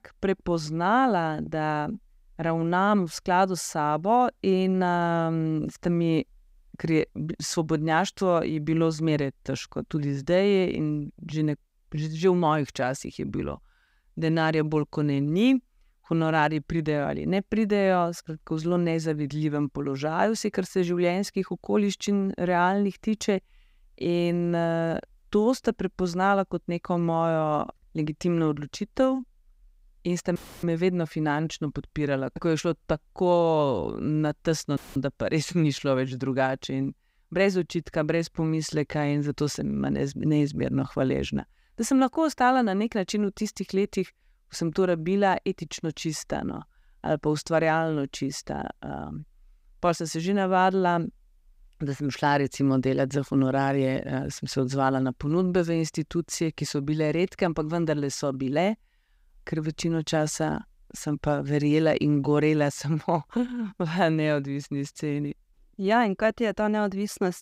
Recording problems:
audio cutting out; filled with static; at 30 s and at 35 s

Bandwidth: 15.5 kHz